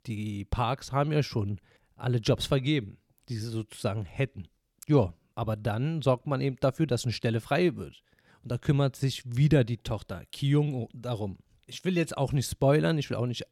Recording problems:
none

